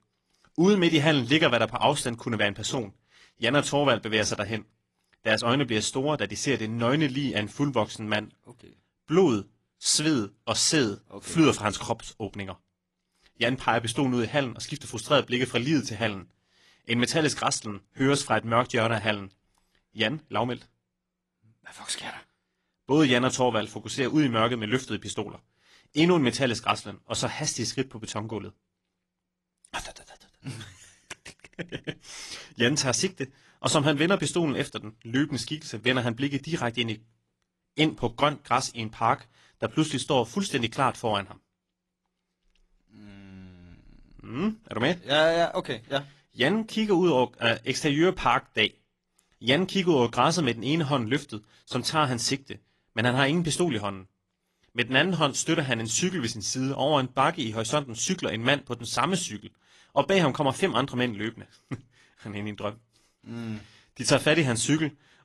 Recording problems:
garbled, watery; slightly

